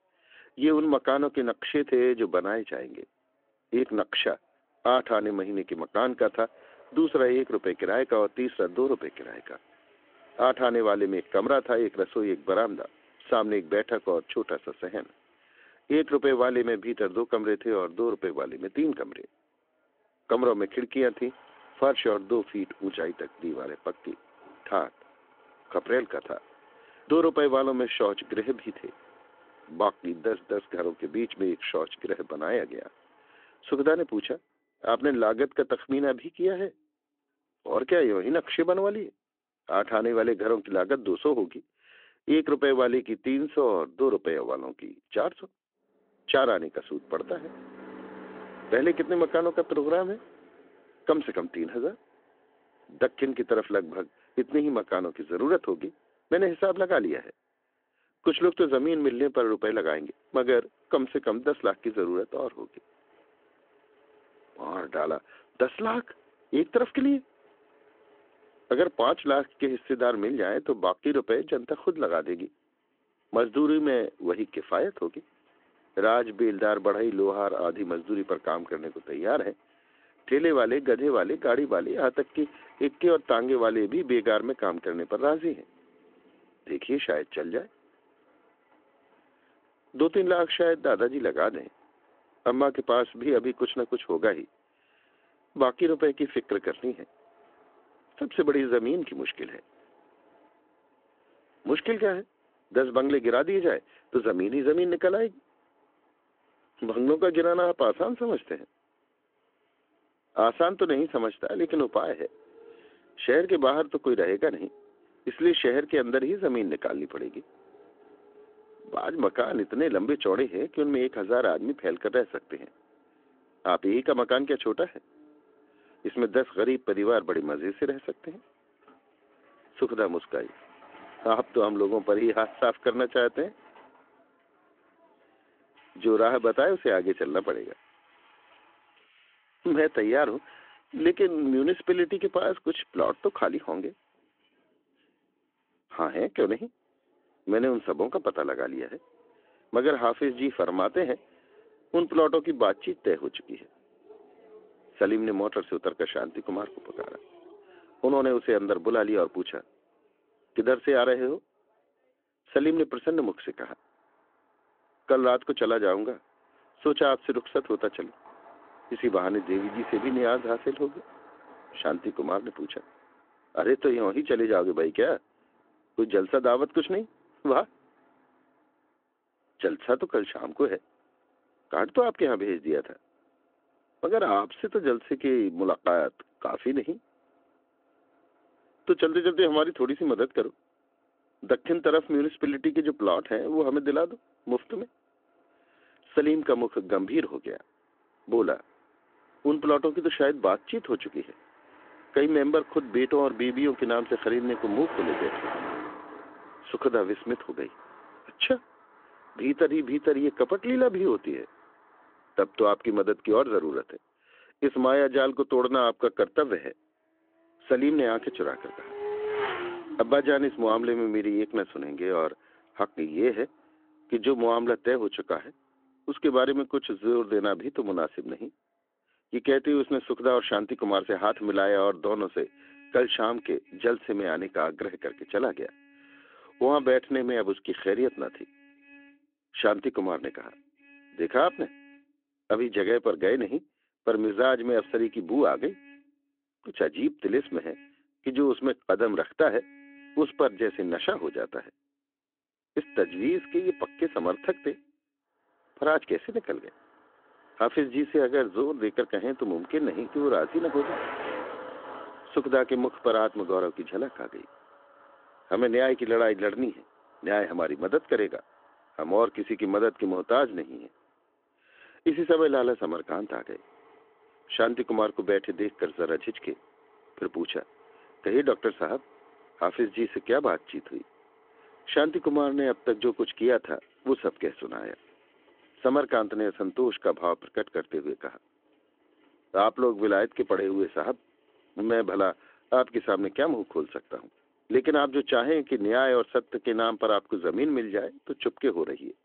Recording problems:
phone-call audio
traffic noise; faint; throughout; 20 dB below the speech

